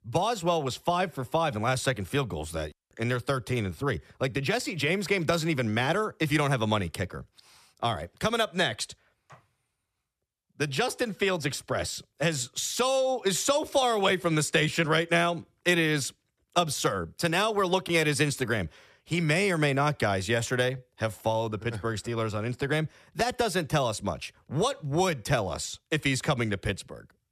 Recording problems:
none

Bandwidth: 14 kHz